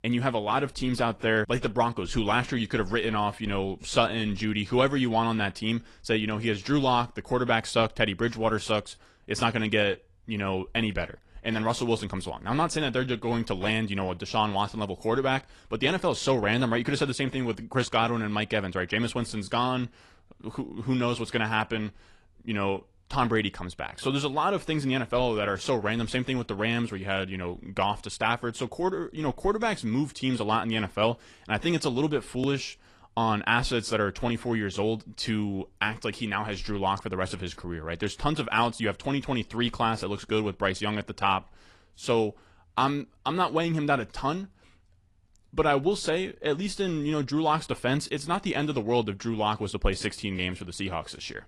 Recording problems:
garbled, watery; slightly

